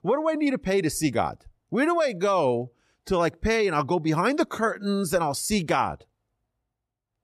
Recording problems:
none

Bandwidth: 13.5 kHz